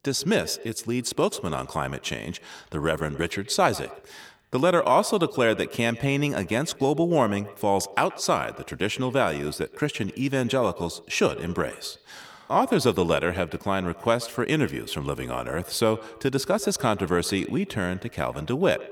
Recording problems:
echo of what is said; noticeable; throughout; 130 ms later, 15 dB below the speech

